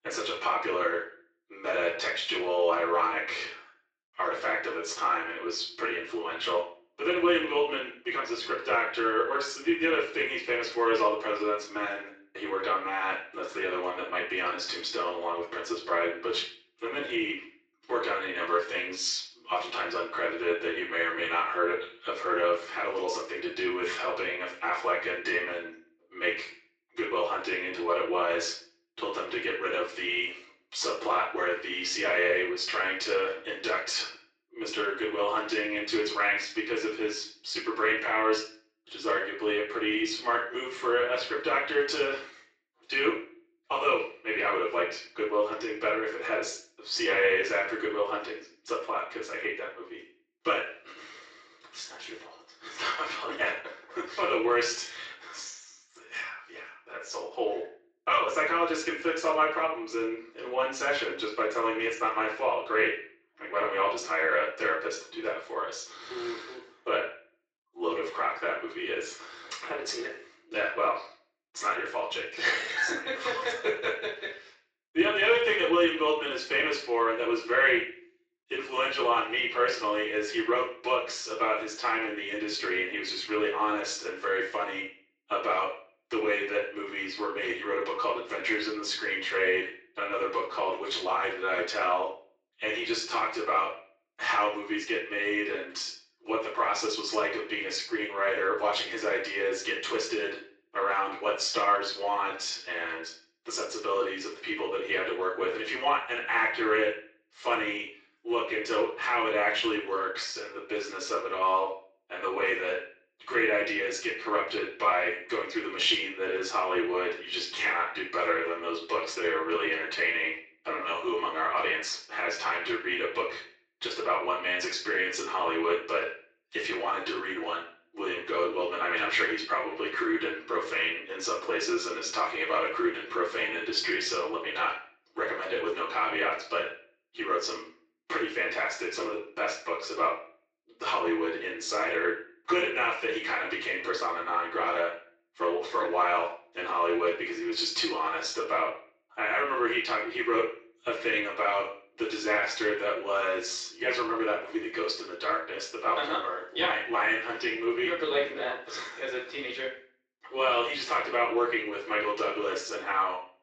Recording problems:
off-mic speech; far
thin; very; fading below 350 Hz
room echo; noticeable; dies away in 0.4 s
garbled, watery; slightly; nothing above 7.5 kHz

